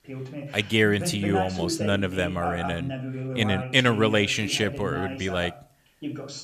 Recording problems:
voice in the background; loud; throughout; 8 dB below the speech

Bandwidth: 14.5 kHz